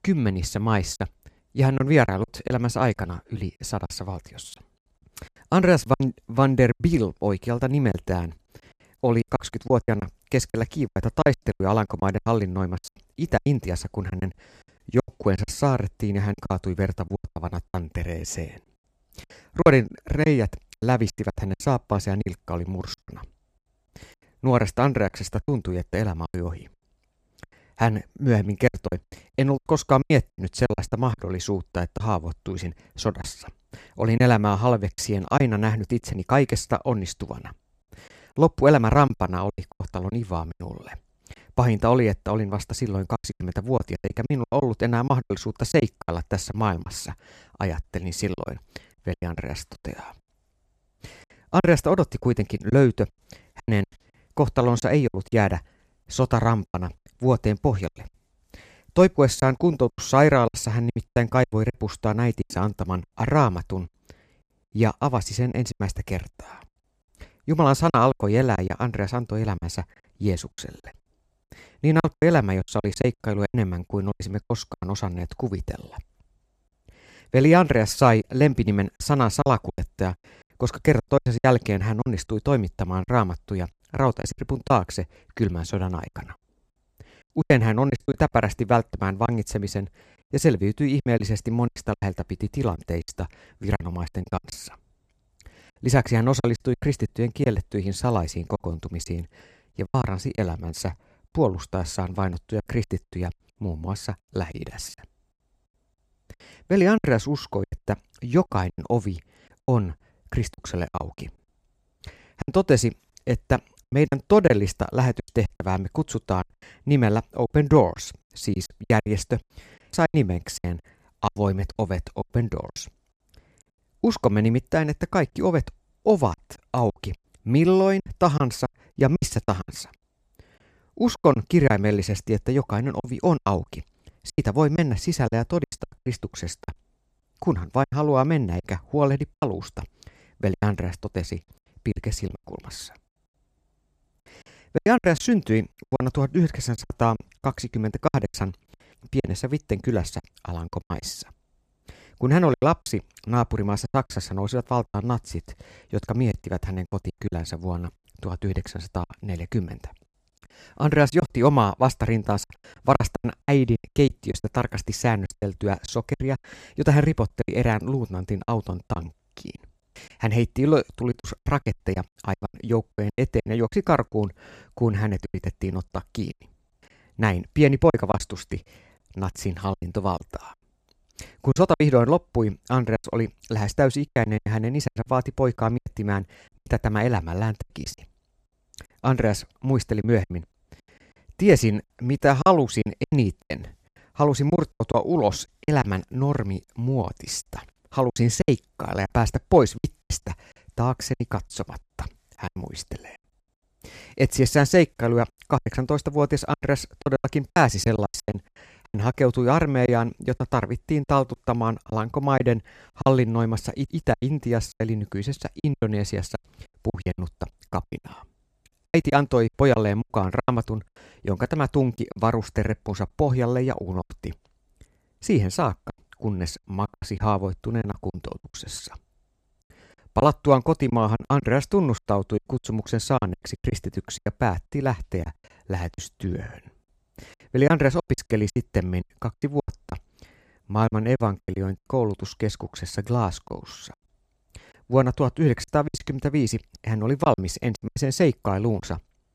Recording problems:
choppy; very; 11% of the speech affected

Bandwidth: 14.5 kHz